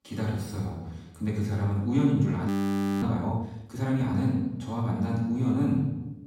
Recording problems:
off-mic speech; far
room echo; noticeable; dies away in 0.9 s
audio freezing; at 2.5 s for 0.5 s

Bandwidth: 16 kHz